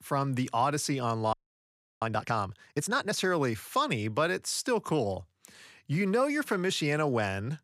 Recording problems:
audio freezing; at 1.5 s for 0.5 s

